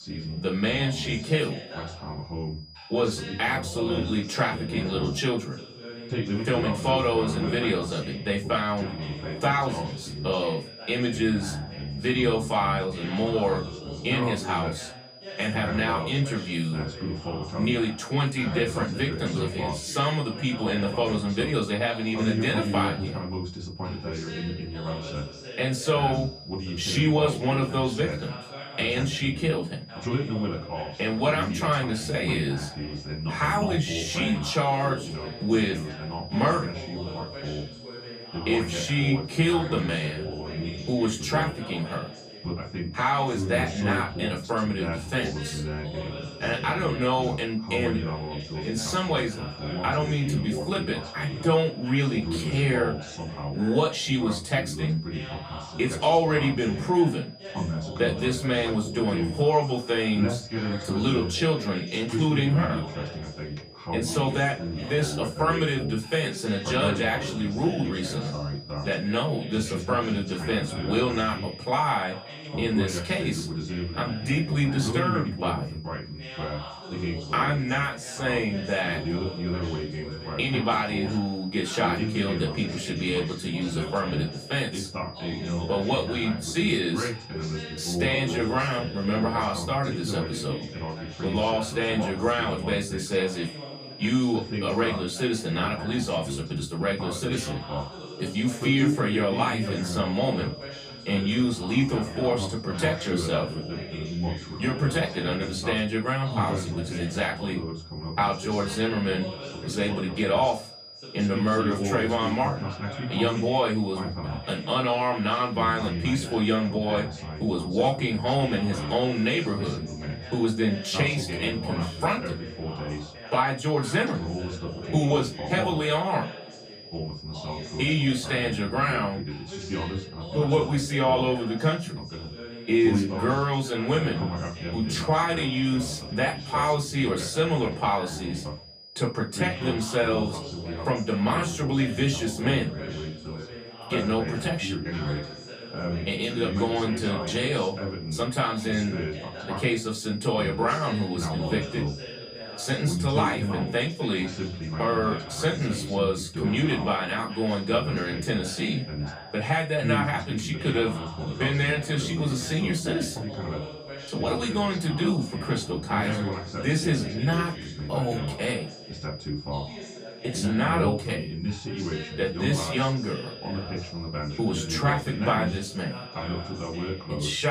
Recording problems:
off-mic speech; far
room echo; very slight; dies away in 0.2 s
background chatter; loud; throughout; 2 voices, 7 dB below the speech
high-pitched whine; noticeable; throughout; 5 kHz, 20 dB below the speech
abrupt cut into speech; at the end

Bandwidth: 15 kHz